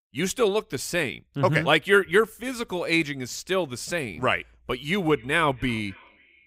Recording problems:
echo of what is said; faint; from 5 s on; 270 ms later, 25 dB below the speech

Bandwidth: 15.5 kHz